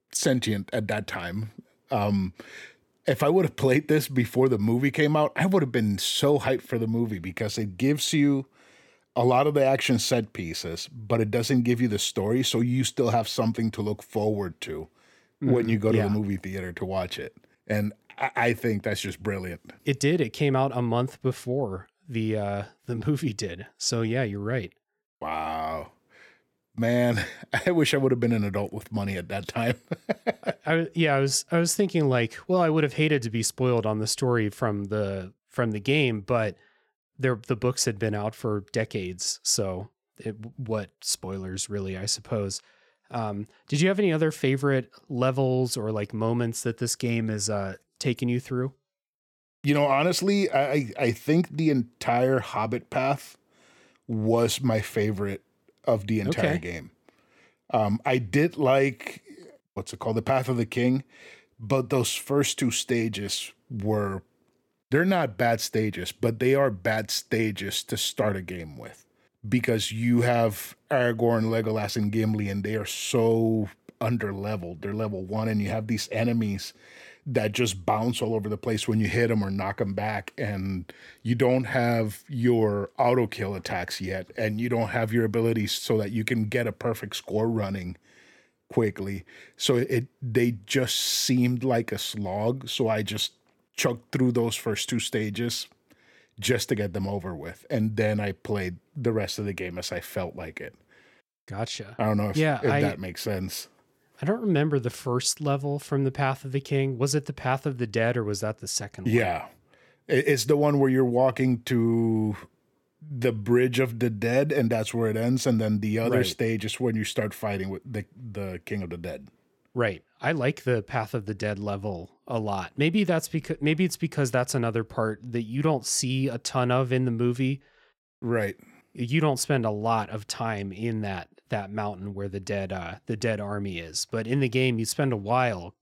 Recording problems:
none

